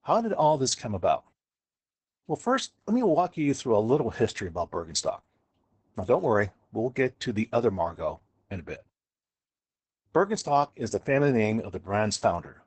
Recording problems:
garbled, watery; badly; nothing above 8 kHz

